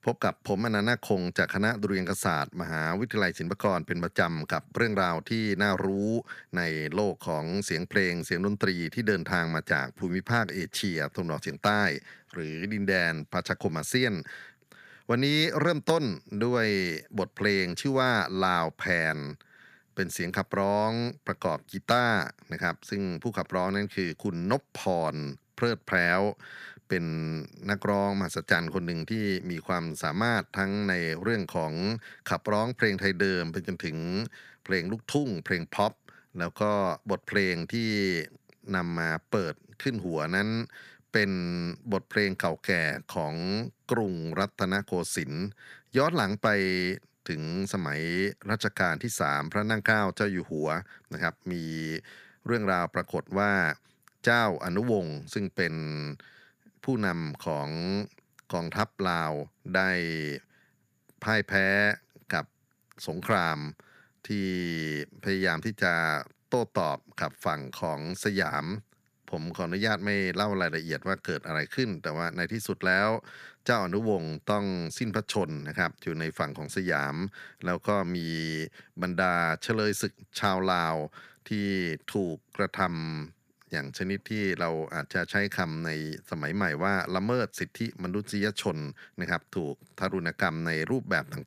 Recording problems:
none

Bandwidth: 15 kHz